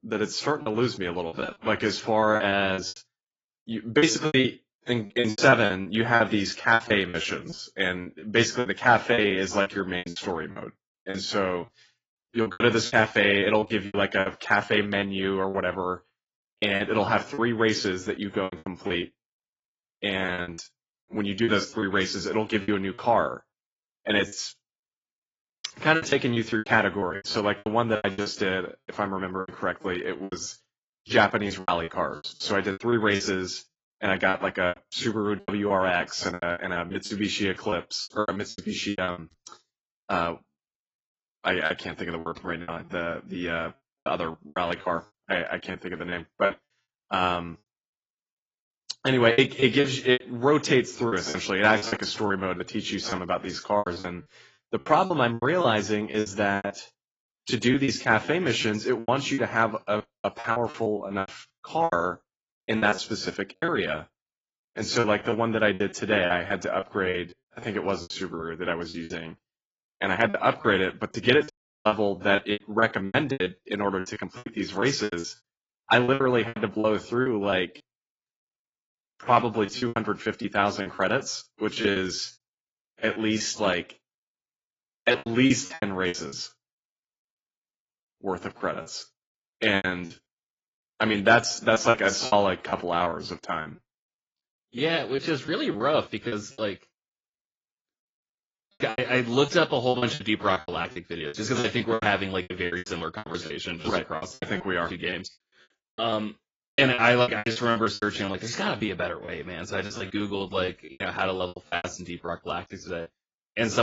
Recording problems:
garbled, watery; badly; nothing above 7.5 kHz
choppy; very; 15% of the speech affected
audio cutting out; at 1:12
abrupt cut into speech; at the end

